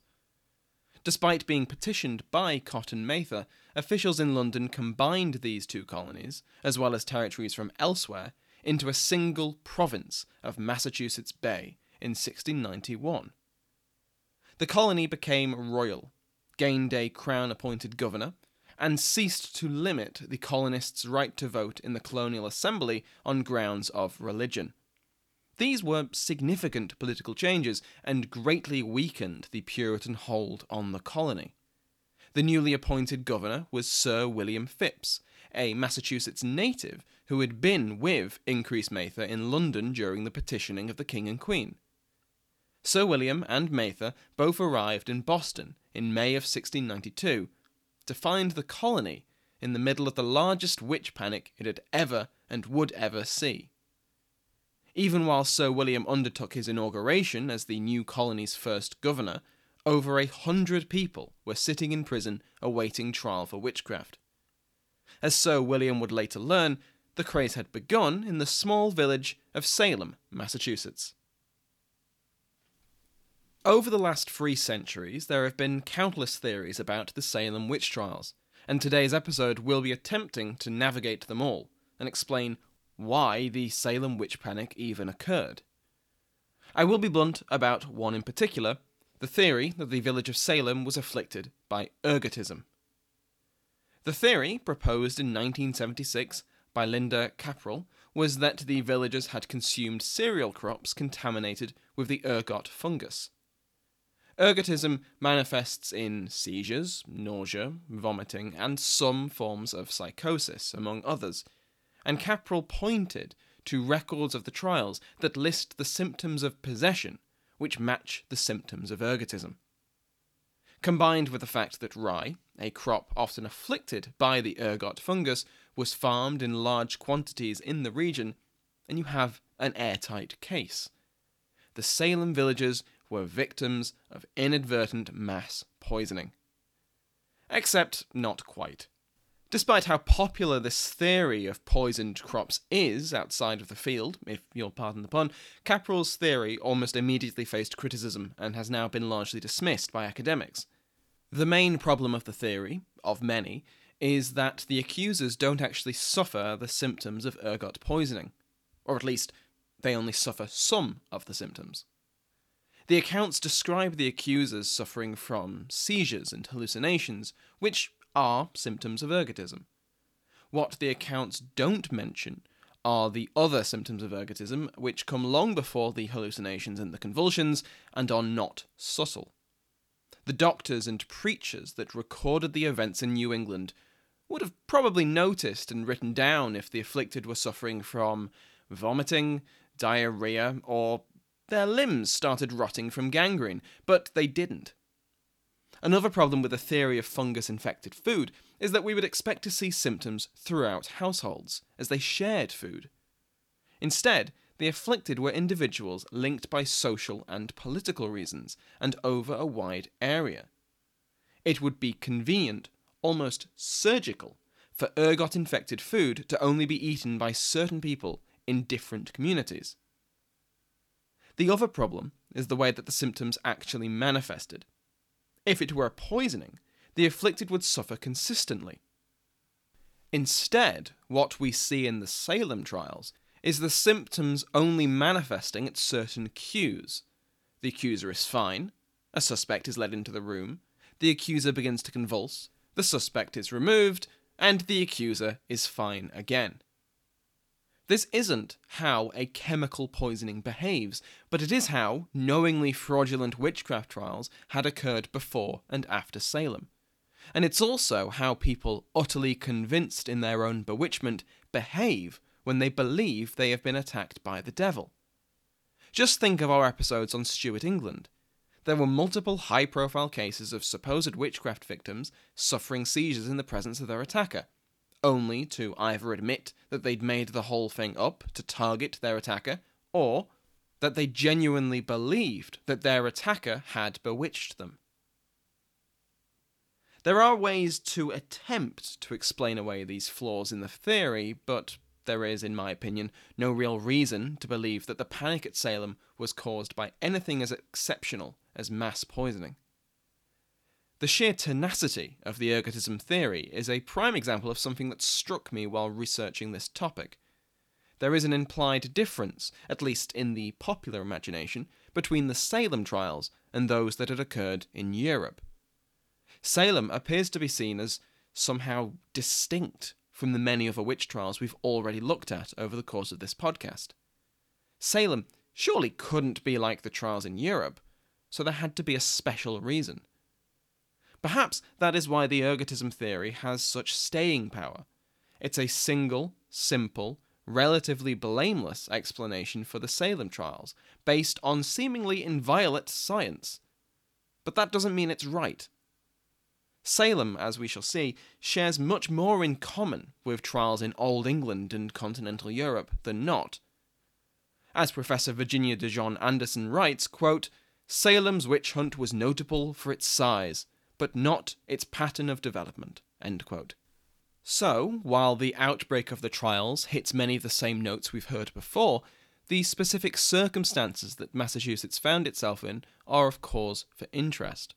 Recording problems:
none

